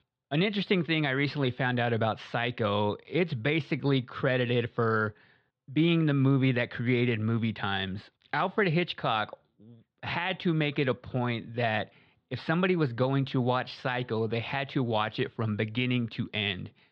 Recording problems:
muffled; slightly; fading above 3.5 kHz

